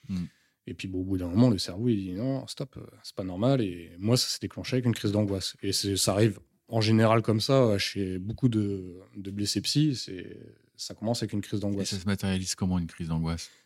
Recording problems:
none

